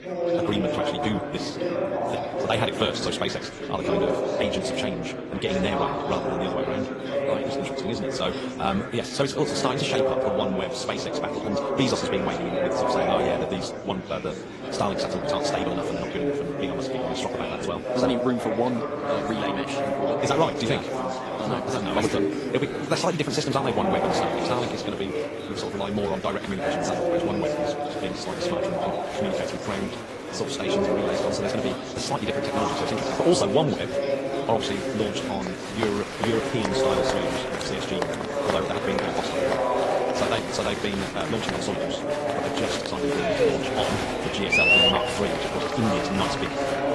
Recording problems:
wrong speed, natural pitch; too fast; 1.8 times normal speed
garbled, watery; slightly
murmuring crowd; very loud; throughout; 2 dB above the speech

